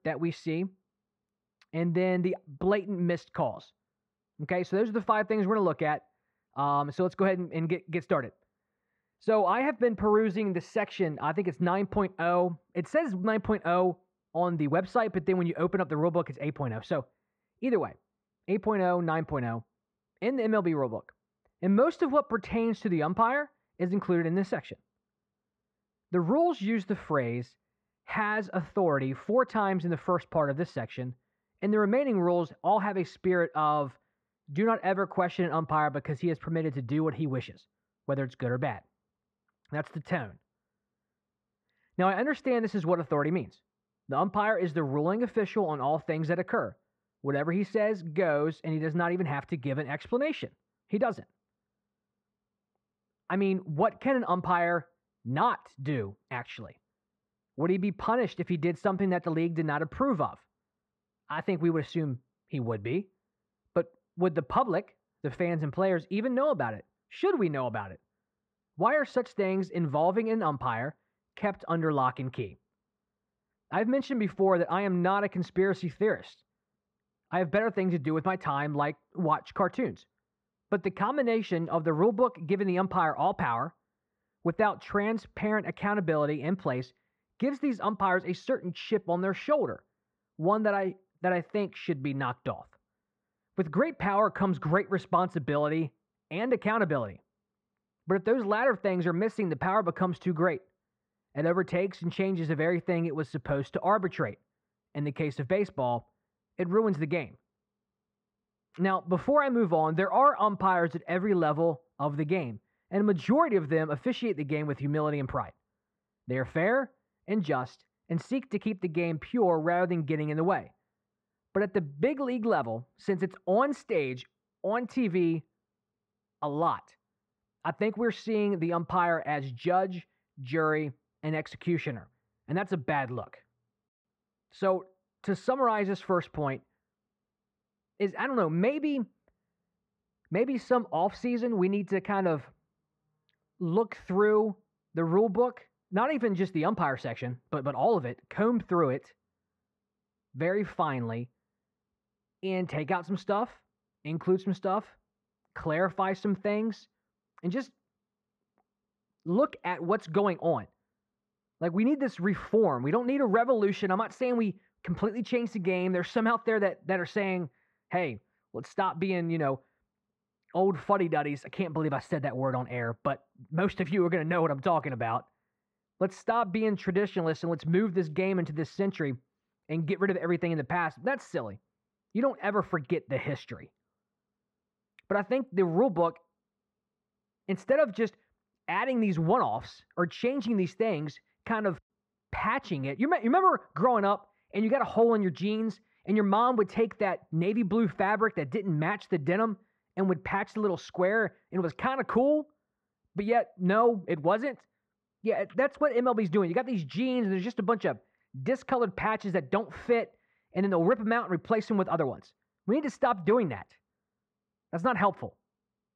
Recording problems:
muffled; very; fading above 1.5 kHz

